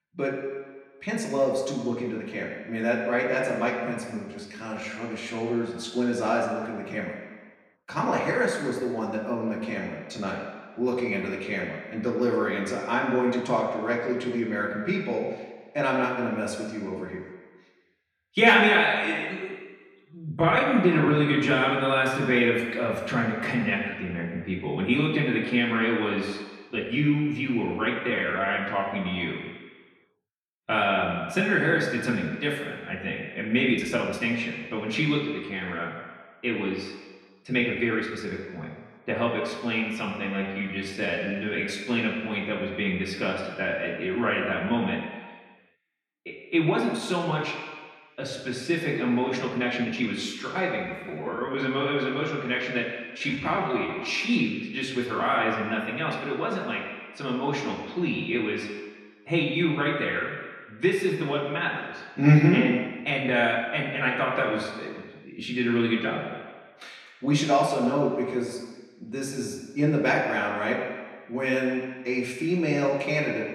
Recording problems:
off-mic speech; far
room echo; noticeable; dies away in 1.5 s
uneven, jittery; strongly; from 1 s to 1:04

